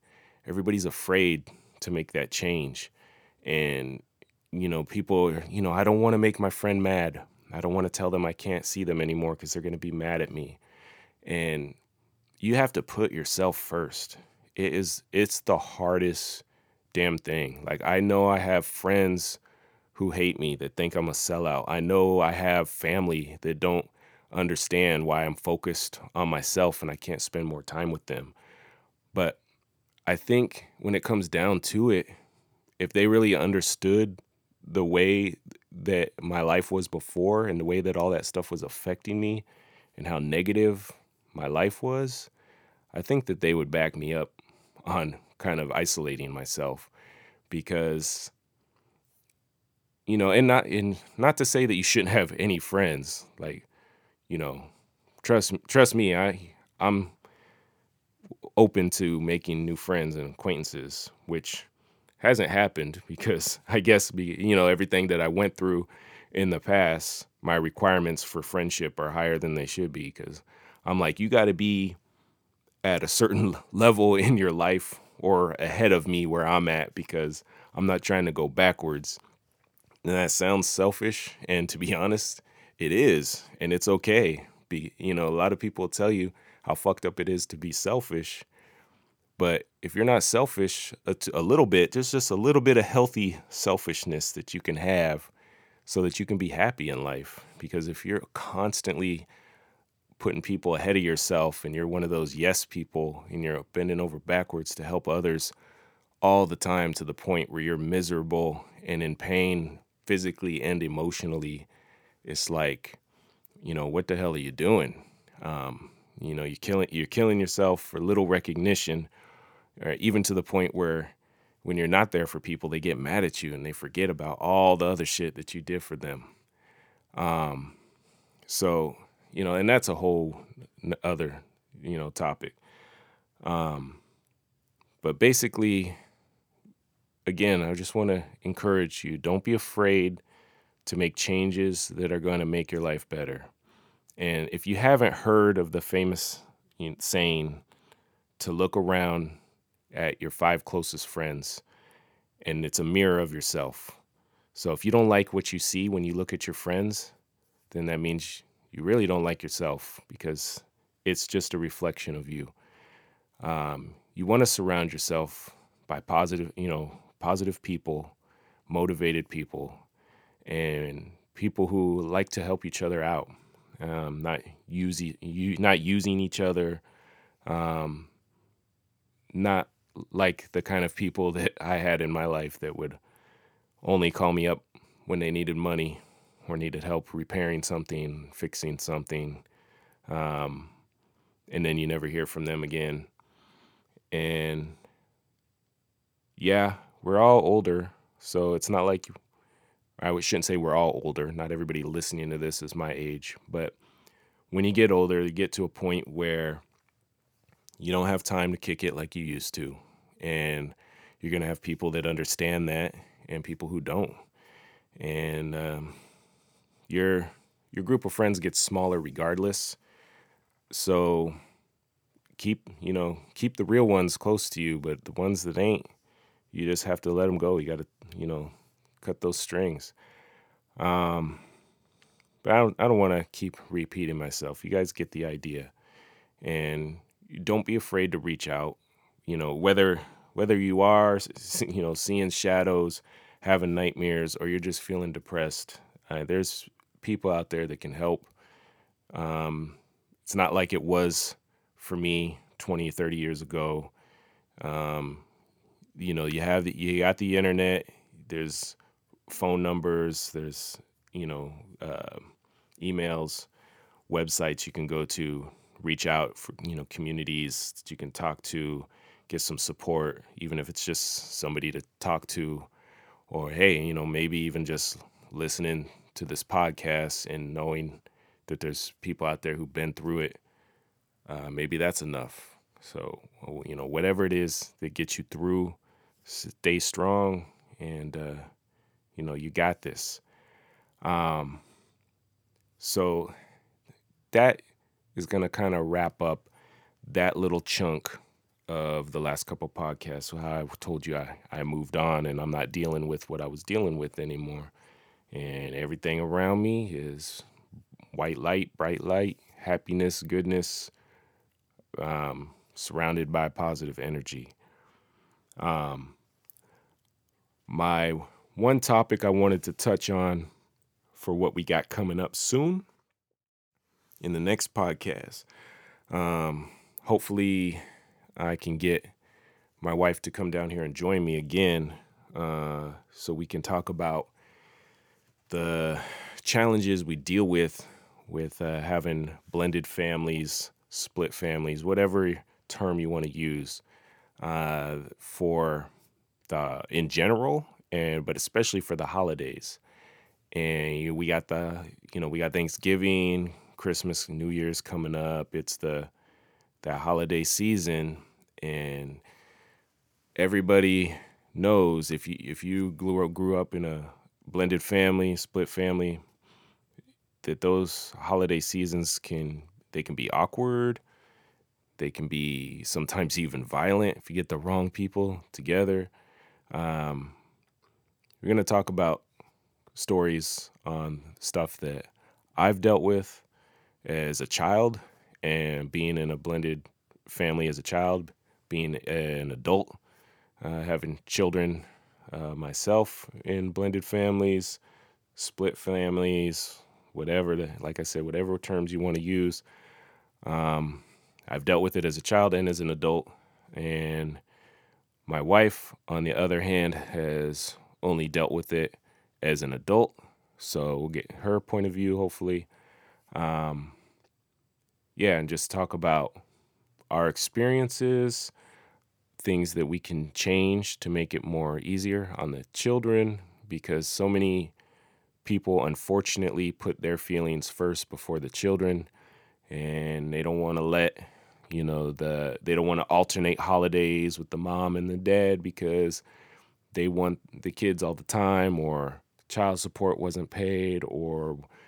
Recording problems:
none

